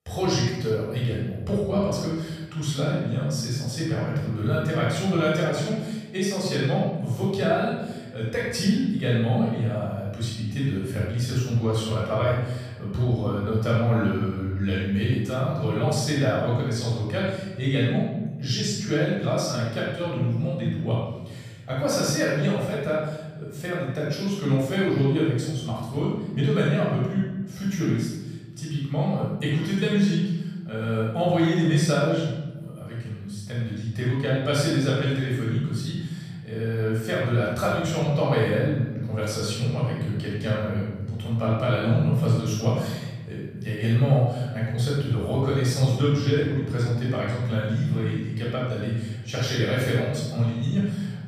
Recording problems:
room echo; strong; dies away in 1.4 s
off-mic speech; far

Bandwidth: 15 kHz